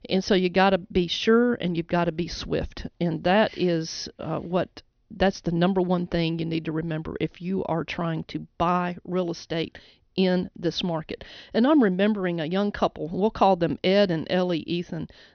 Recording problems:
high frequencies cut off; noticeable; nothing above 6 kHz

